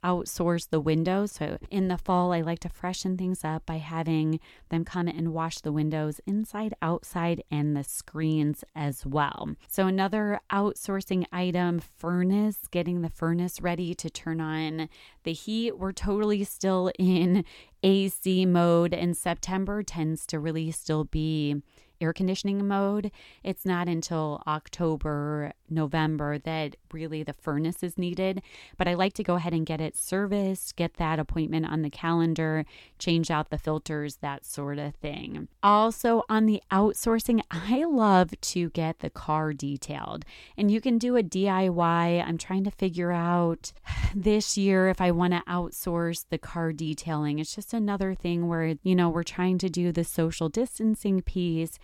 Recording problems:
uneven, jittery; strongly; from 4.5 to 44 s

